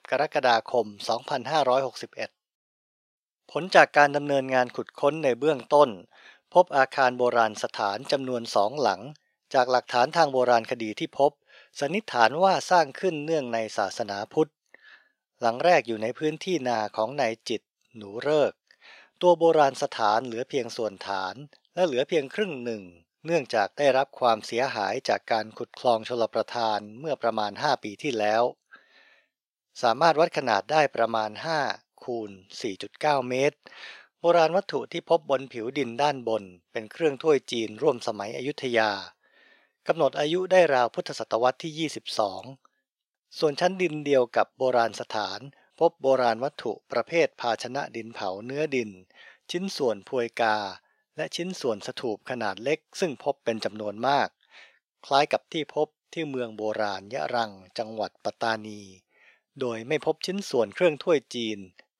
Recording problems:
thin; very; fading below 550 Hz

